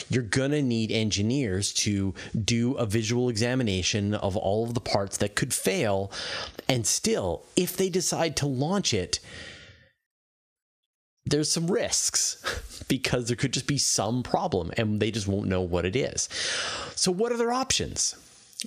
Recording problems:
squashed, flat; somewhat

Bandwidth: 14.5 kHz